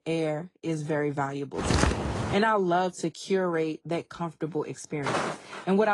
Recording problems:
garbled, watery; slightly
footsteps; loud; at 1.5 s; peak 3 dB above the speech
footsteps; noticeable; at 5 s; peak 1 dB below the speech
abrupt cut into speech; at the end

